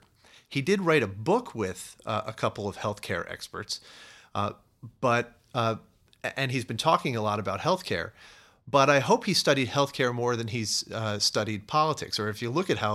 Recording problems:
abrupt cut into speech; at the end

